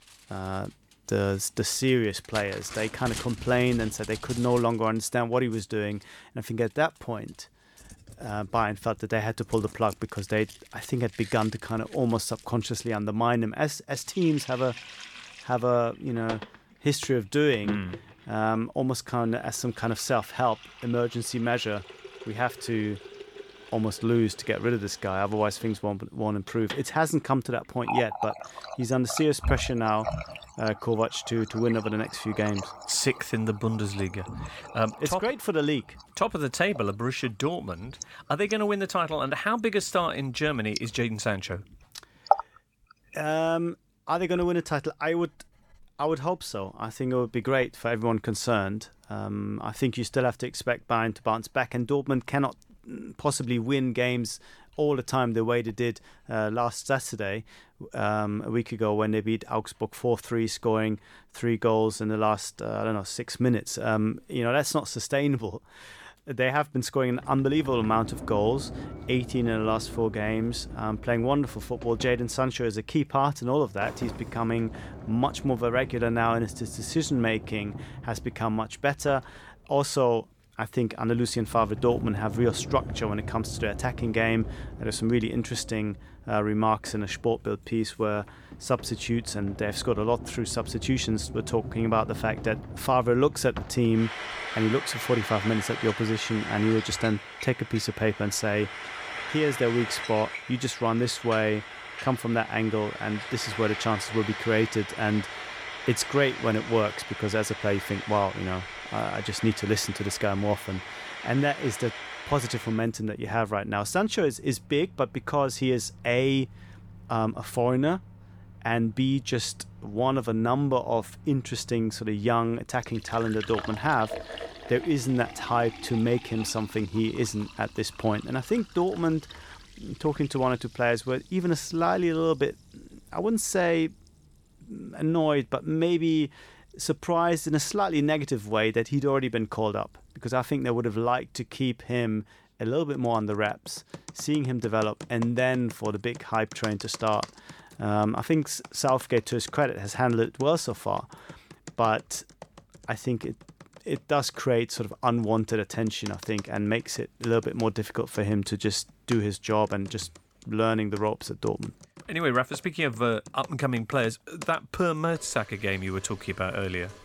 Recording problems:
household noises; noticeable; throughout; 10 dB below the speech

